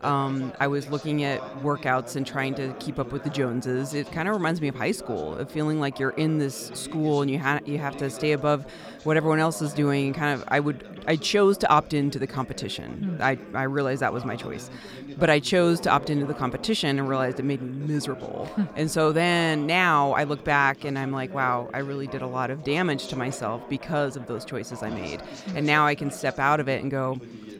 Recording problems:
background chatter; noticeable; throughout; 3 voices, 15 dB below the speech

